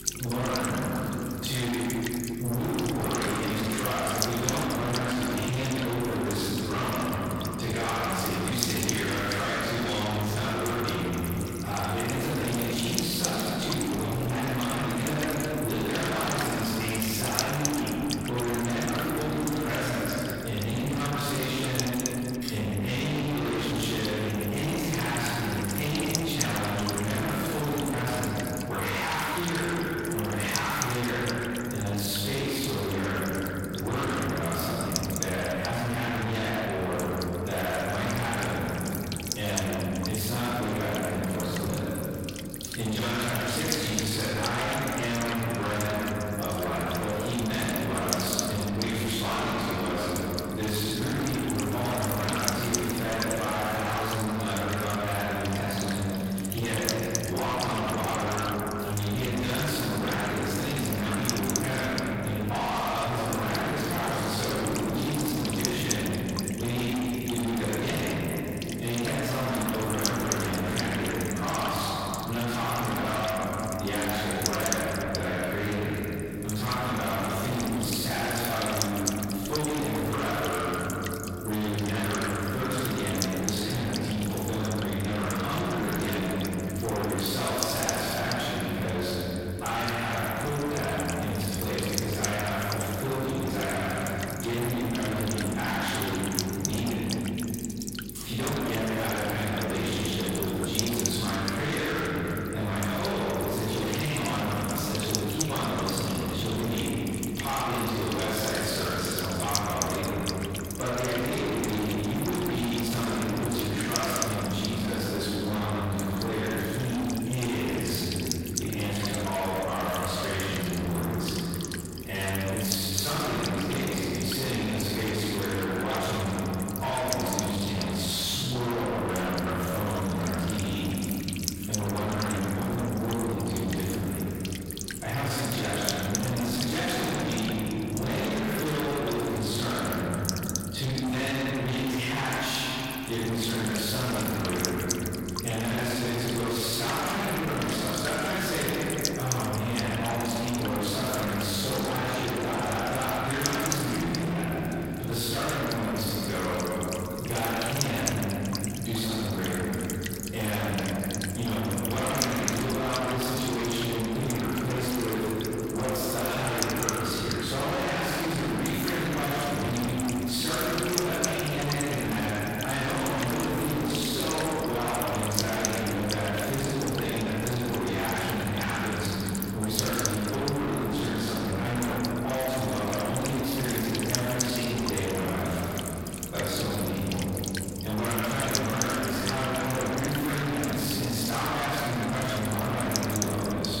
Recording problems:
distortion; heavy; 6 dB below the speech
room echo; strong; dies away in 2.5 s
off-mic speech; far
electrical hum; loud; throughout; 50 Hz, 8 dB below the speech

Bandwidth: 16 kHz